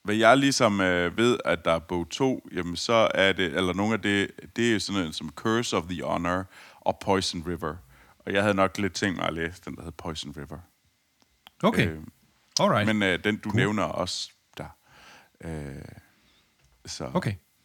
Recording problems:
none

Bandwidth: 18.5 kHz